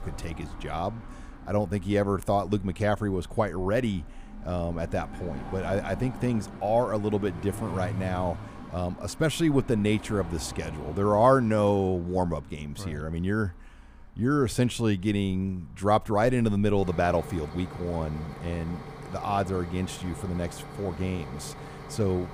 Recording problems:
traffic noise; noticeable; throughout; 15 dB below the speech

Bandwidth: 15 kHz